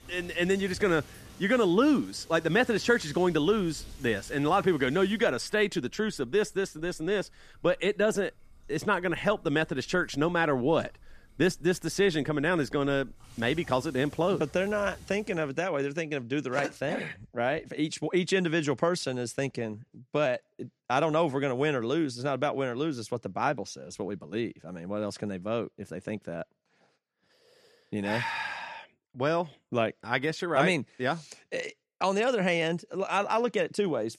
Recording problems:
rain or running water; faint; until 15 s; 25 dB below the speech

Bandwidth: 14.5 kHz